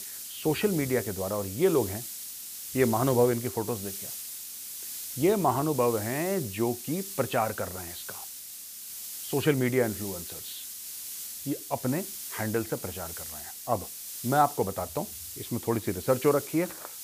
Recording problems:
high frequencies cut off; severe; nothing above 5 kHz
hiss; loud; throughout; 8 dB below the speech

